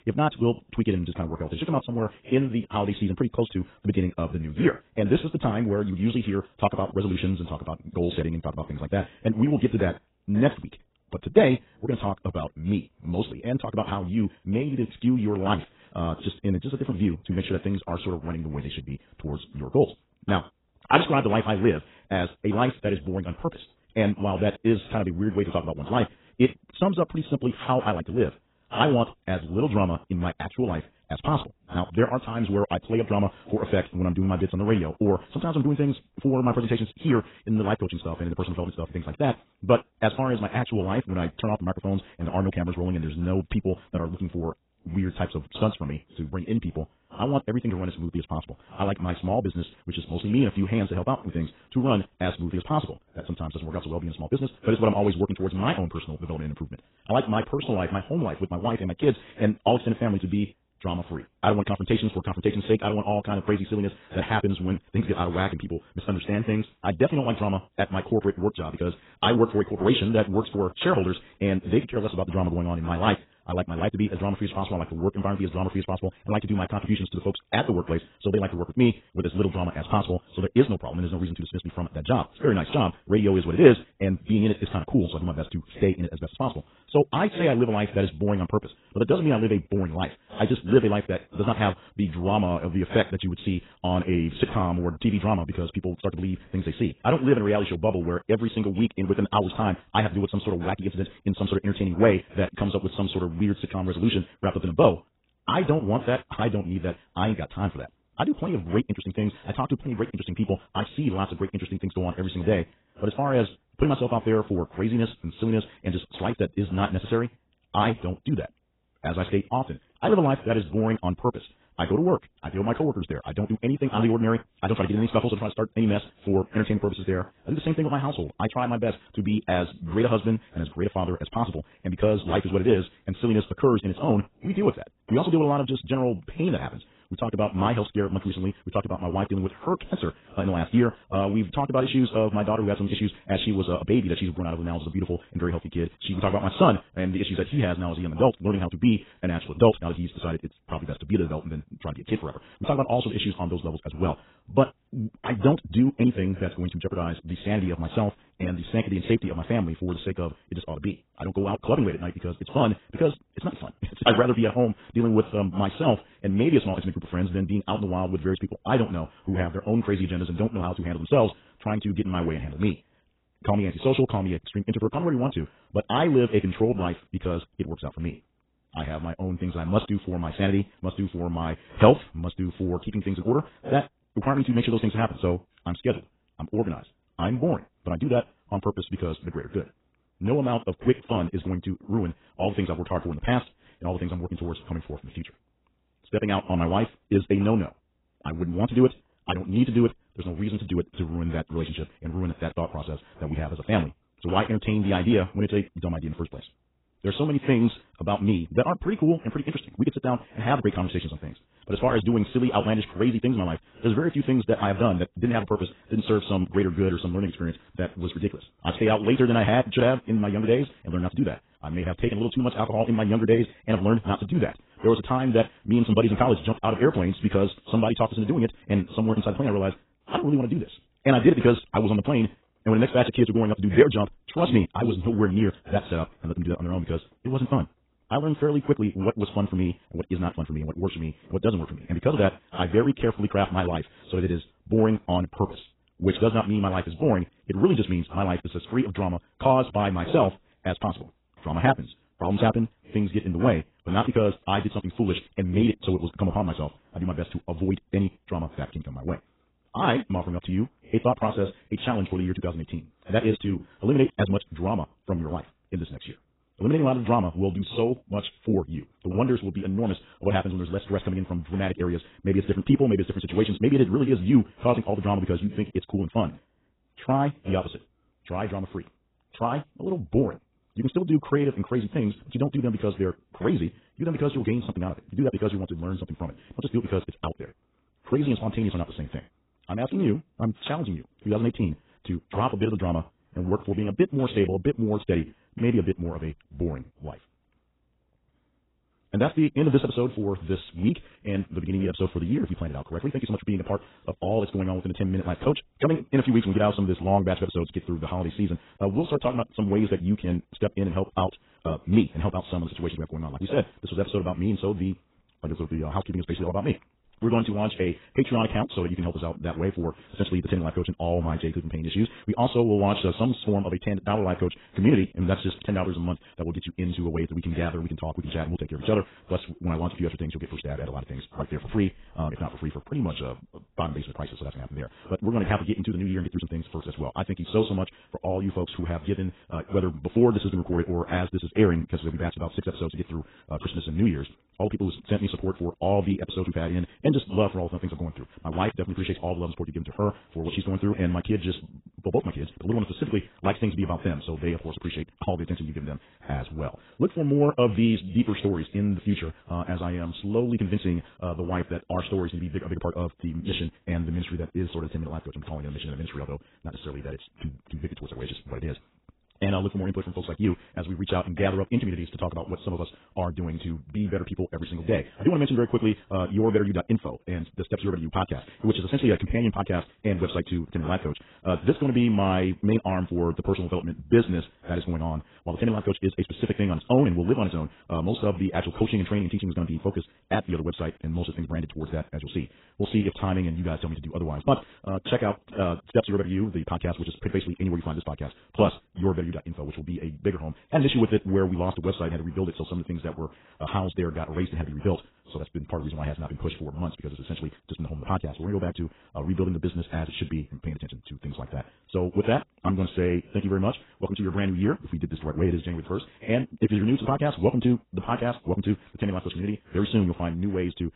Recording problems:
garbled, watery; badly; nothing above 4 kHz
wrong speed, natural pitch; too fast; 1.8 times normal speed

